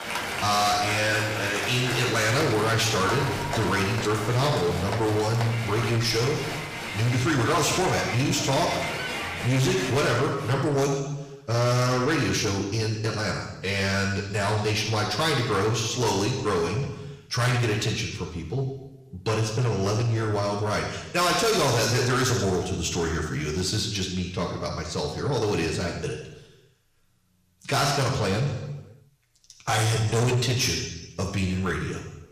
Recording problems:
distortion; heavy; 7 dB below the speech
room echo; noticeable; dies away in 0.9 s
off-mic speech; somewhat distant
crowd noise; loud; until 10 s; 6 dB below the speech

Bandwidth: 15 kHz